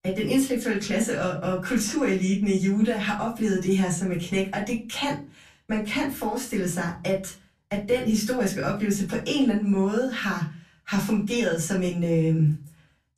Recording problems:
off-mic speech; far
room echo; slight; dies away in 0.3 s

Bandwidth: 14.5 kHz